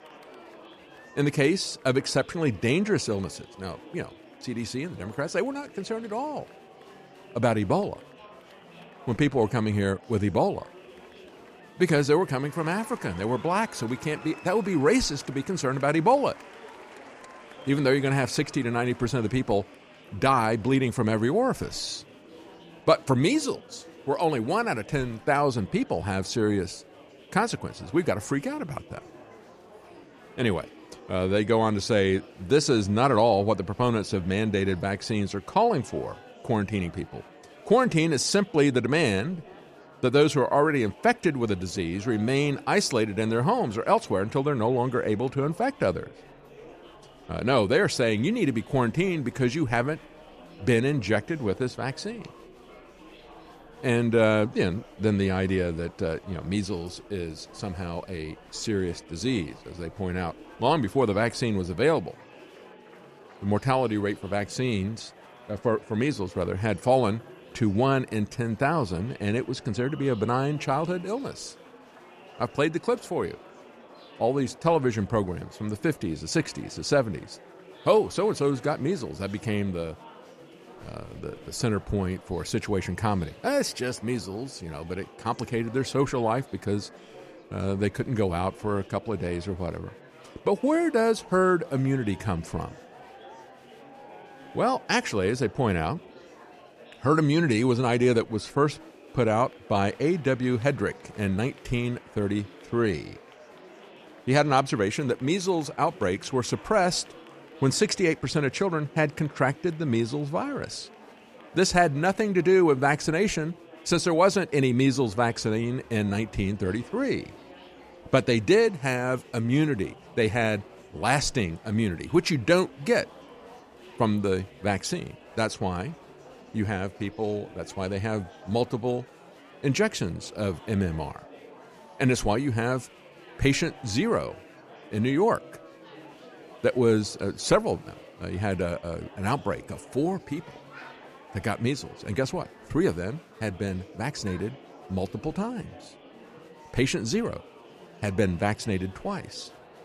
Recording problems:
murmuring crowd; faint; throughout; 20 dB below the speech

